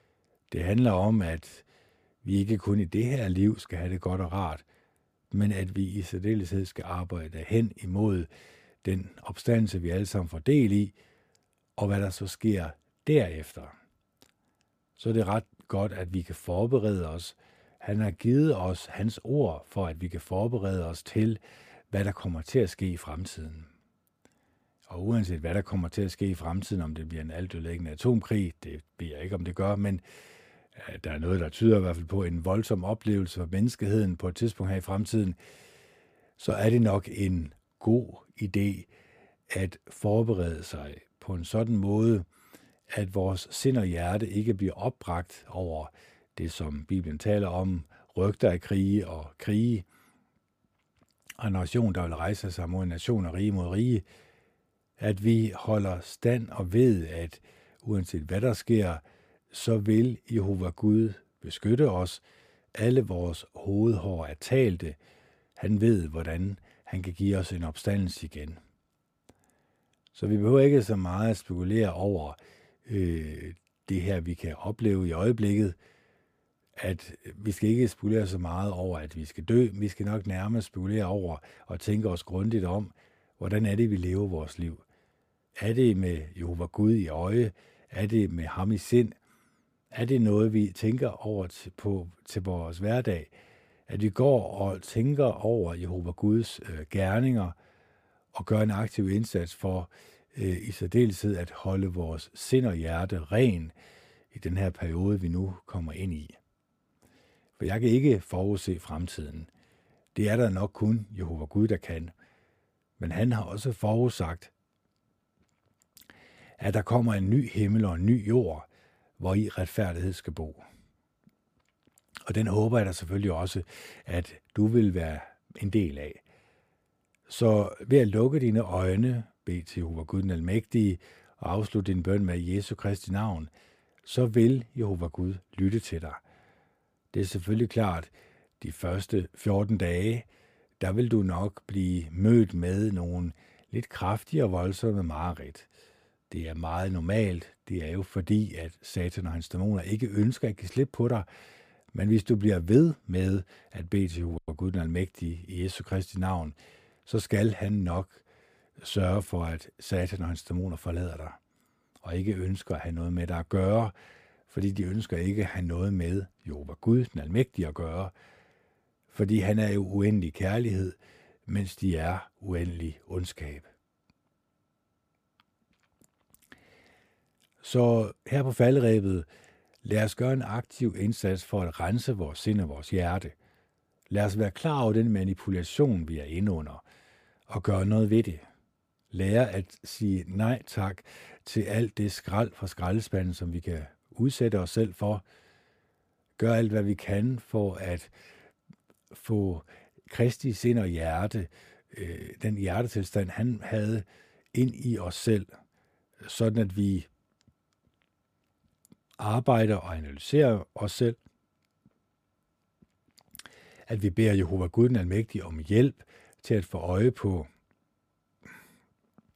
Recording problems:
uneven, jittery; slightly; from 18 s to 3:20

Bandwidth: 15 kHz